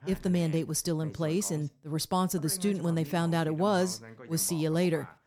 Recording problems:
voice in the background; noticeable; throughout; 20 dB below the speech

